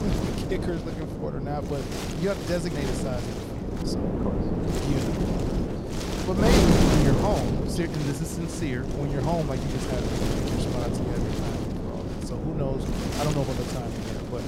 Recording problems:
wind noise on the microphone; heavy; 2 dB above the speech

